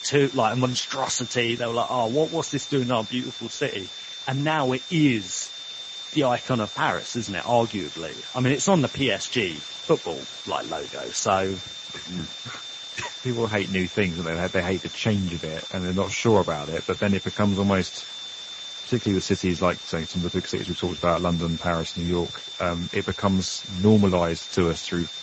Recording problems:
garbled, watery; slightly; nothing above 7.5 kHz
high-pitched whine; noticeable; throughout; 3.5 kHz, 10 dB below the speech
hiss; noticeable; throughout; 15 dB below the speech

